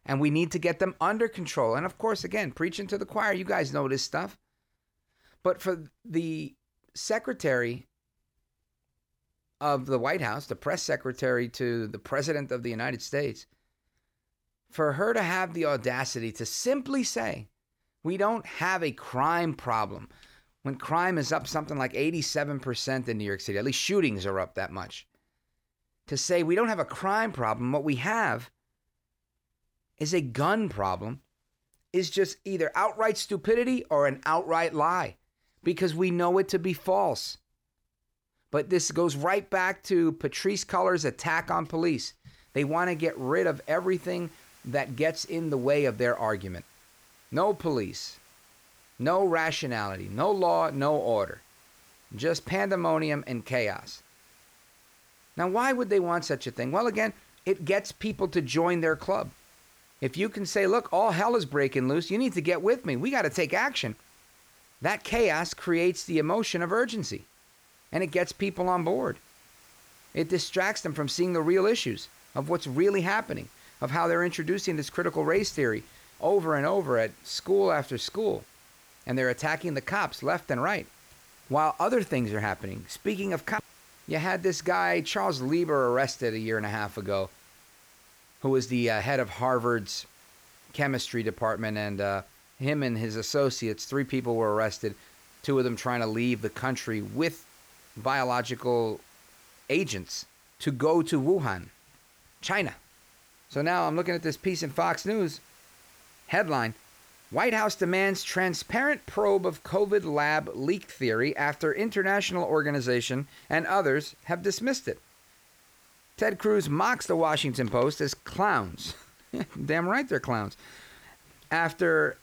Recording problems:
hiss; faint; from 43 s on; 25 dB below the speech

